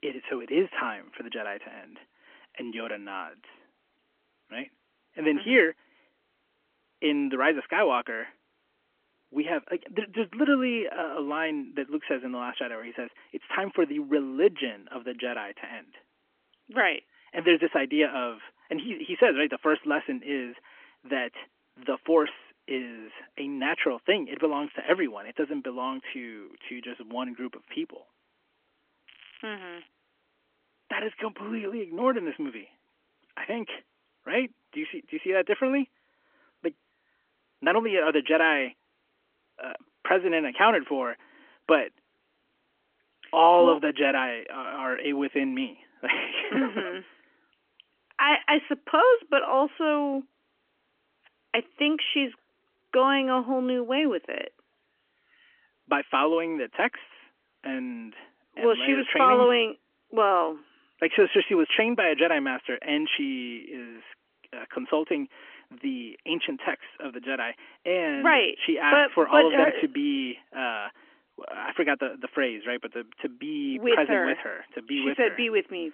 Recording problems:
phone-call audio; nothing above 3 kHz
crackling; faint; at 25 s and at 29 s; 25 dB below the speech

